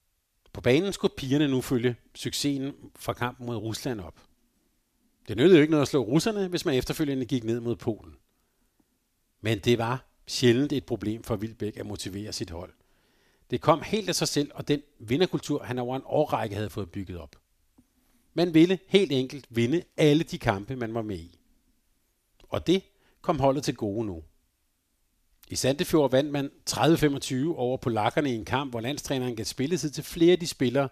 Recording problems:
none

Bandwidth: 14.5 kHz